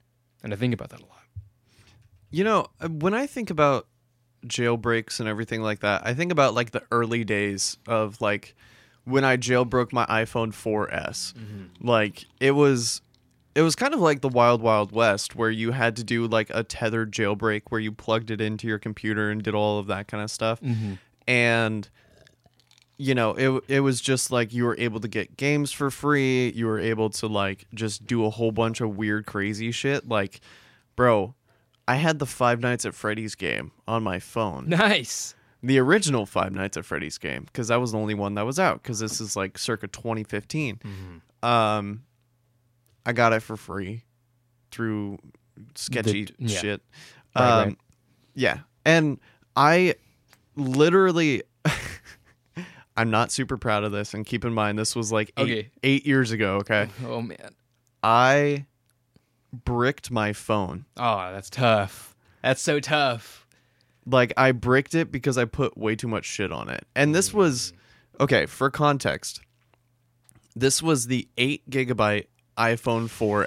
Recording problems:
abrupt cut into speech; at the end

